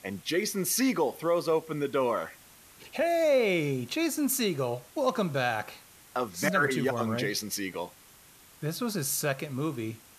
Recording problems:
hiss; faint; throughout; 25 dB below the speech

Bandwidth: 14.5 kHz